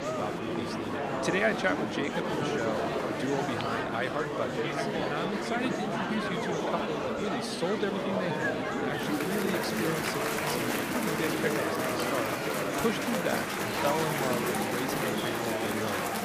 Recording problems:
chatter from many people; very loud; throughout; 4 dB above the speech

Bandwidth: 15 kHz